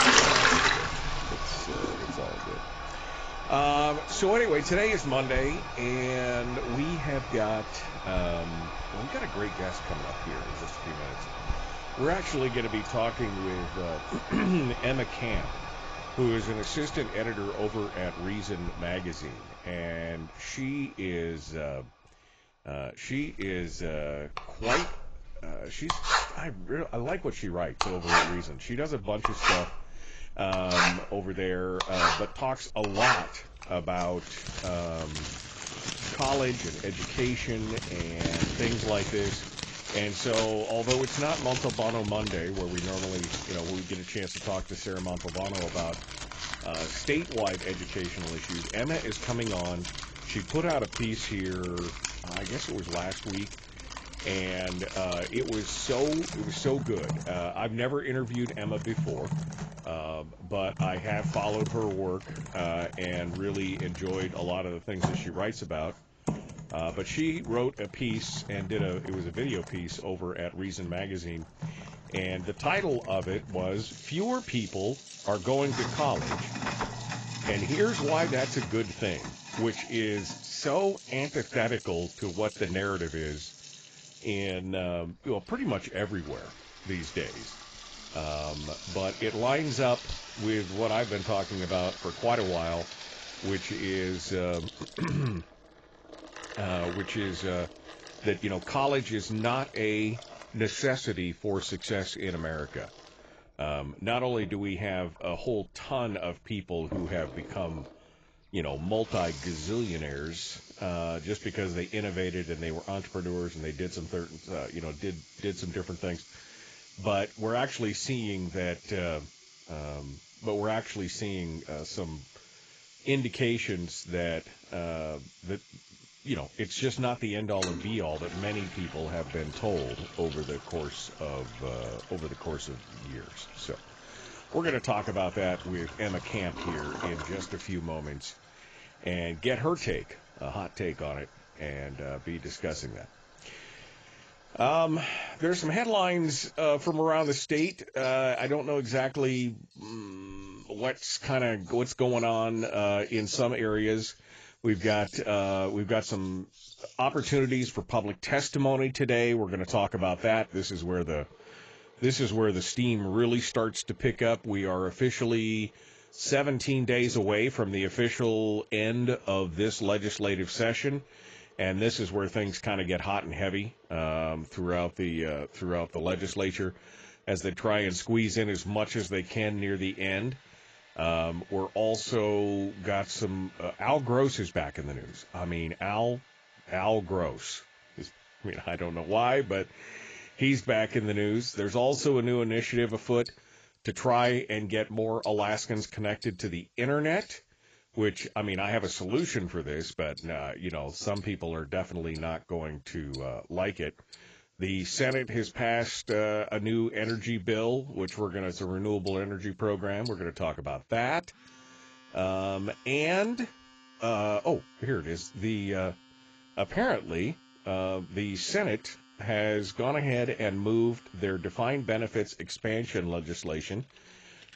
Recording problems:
garbled, watery; badly; nothing above 7.5 kHz
household noises; loud; throughout; 5 dB below the speech

